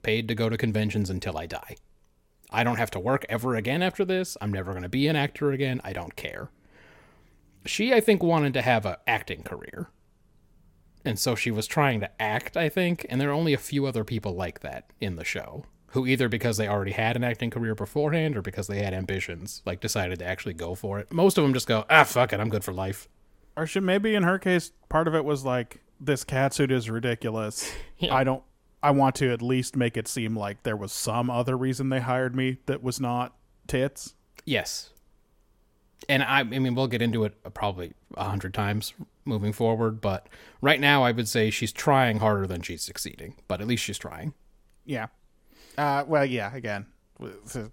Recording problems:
none

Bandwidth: 16.5 kHz